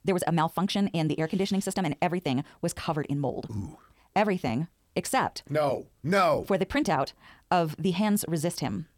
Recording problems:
wrong speed, natural pitch; too fast; 1.7 times normal speed

